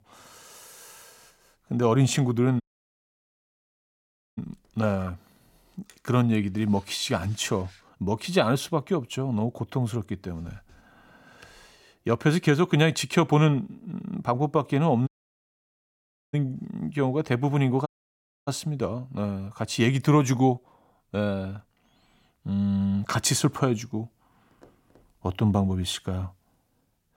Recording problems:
audio cutting out; at 2.5 s for 2 s, at 15 s for 1.5 s and at 18 s for 0.5 s

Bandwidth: 16.5 kHz